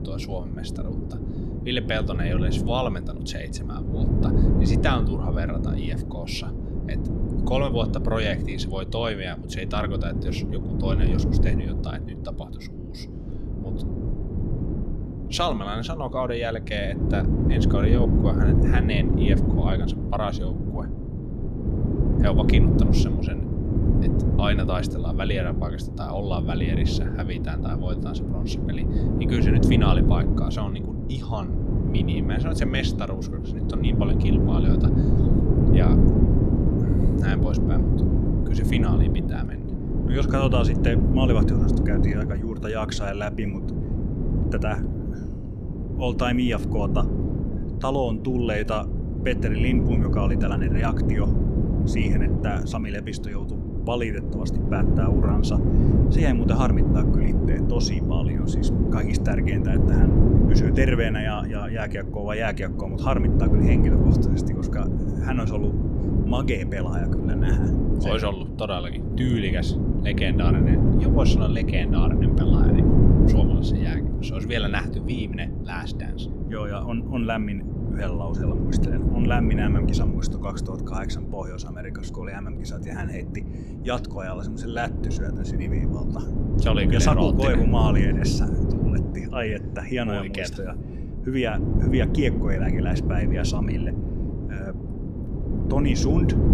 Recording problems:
wind noise on the microphone; heavy; 1 dB below the speech

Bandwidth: 13.5 kHz